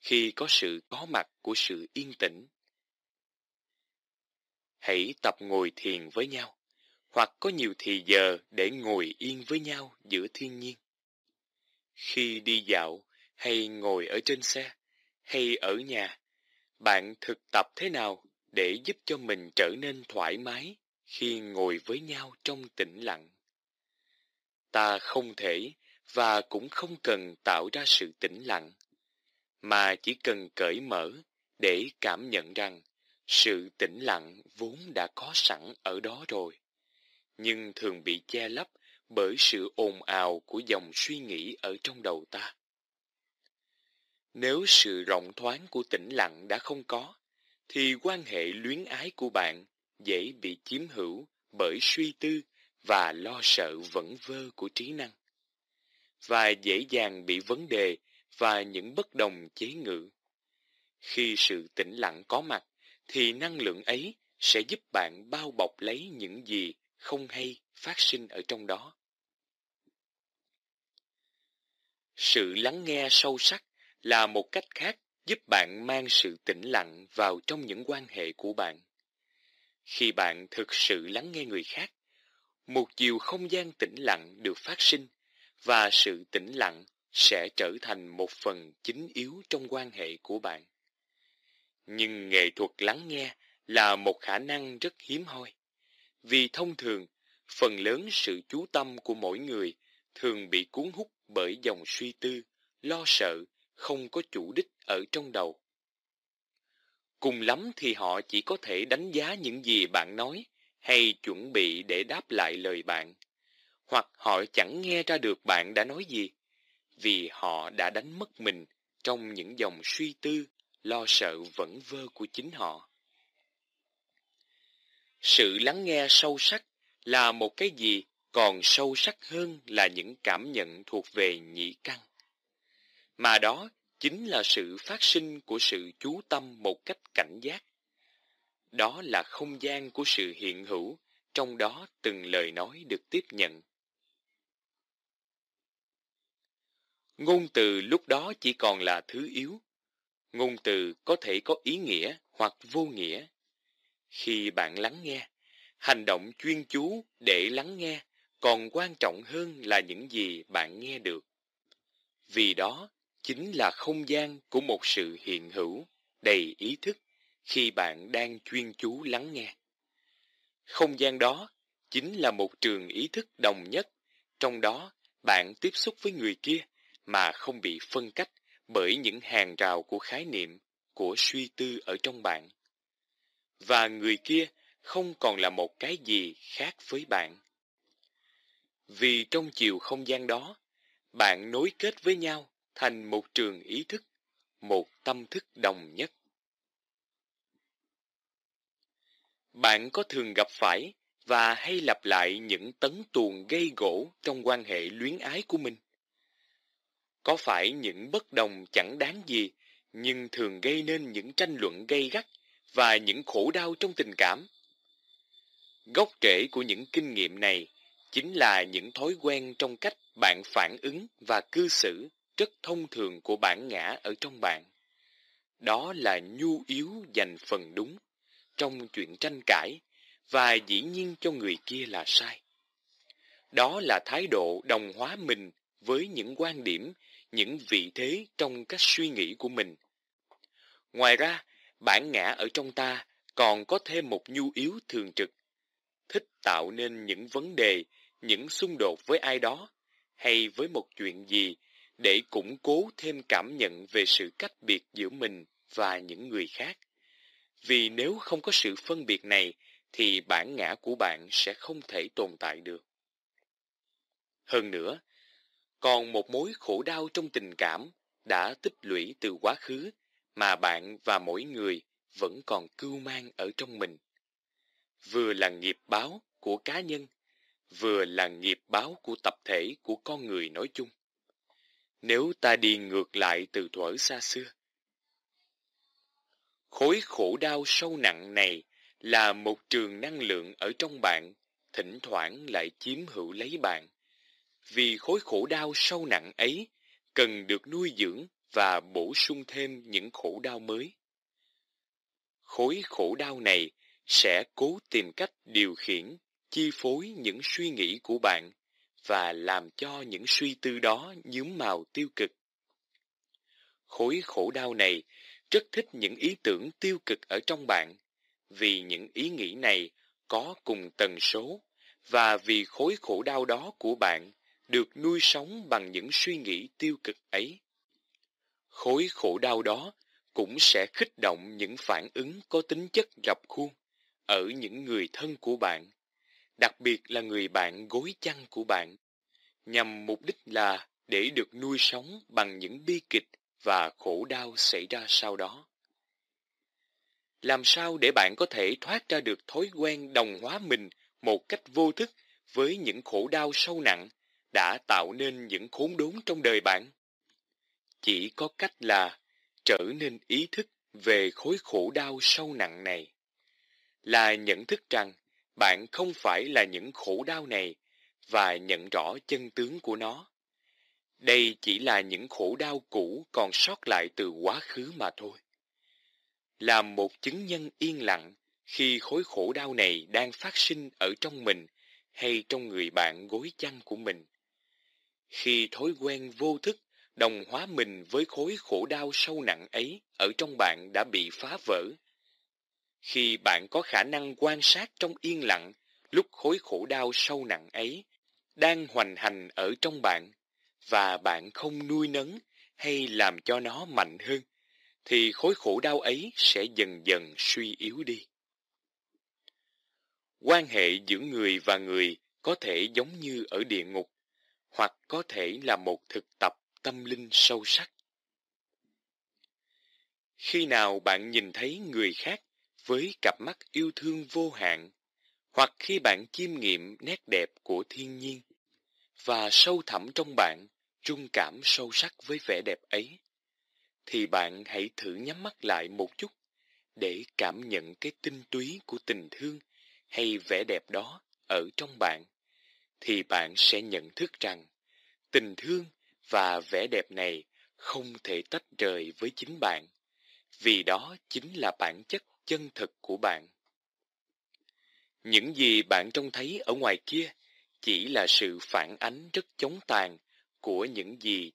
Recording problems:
thin; somewhat; fading below 300 Hz

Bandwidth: 15 kHz